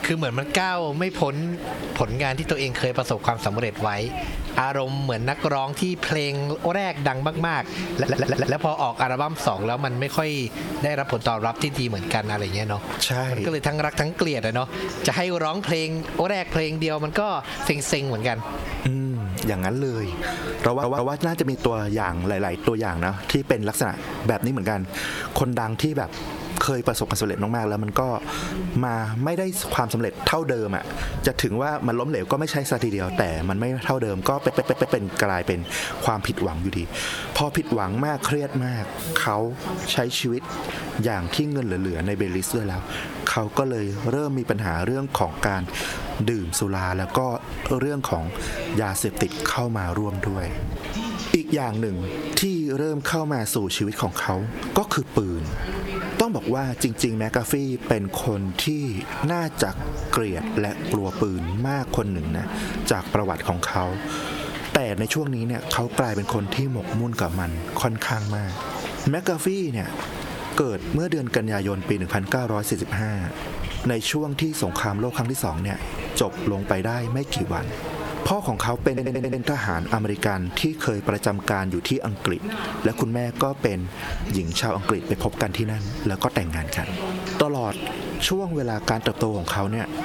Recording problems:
squashed, flat; heavily, background pumping
voice in the background; noticeable; throughout; 15 dB below the speech
hiss; noticeable; throughout; 15 dB below the speech
audio stuttering; 4 times, first at 8 s

